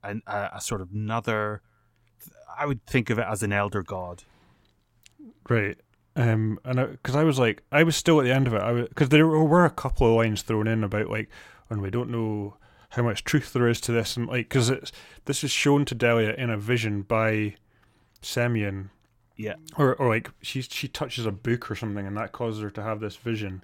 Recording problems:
none

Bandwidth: 16.5 kHz